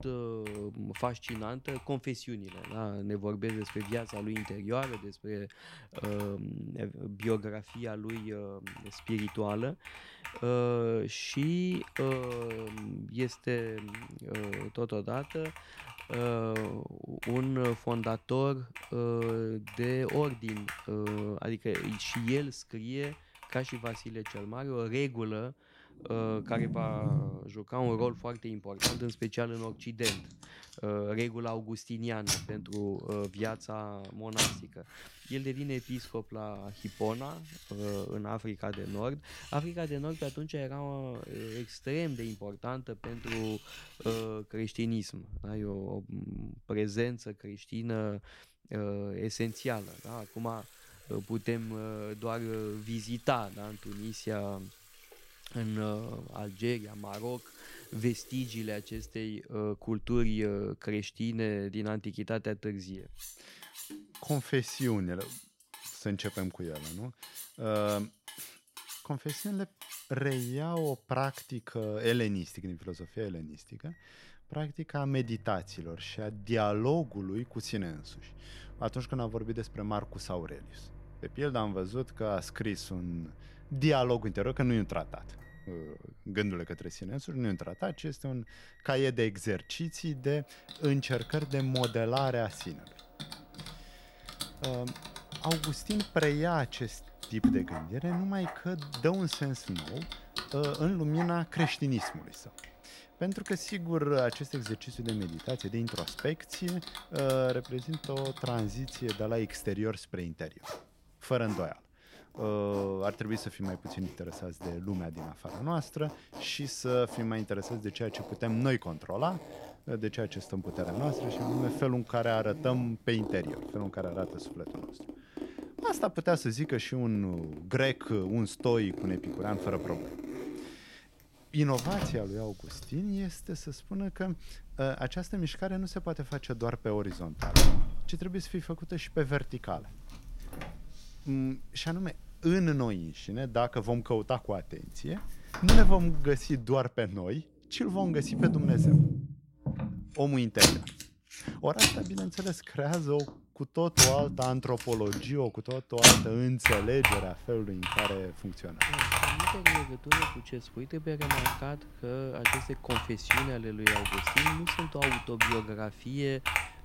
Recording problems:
household noises; very loud; throughout; 2 dB above the speech

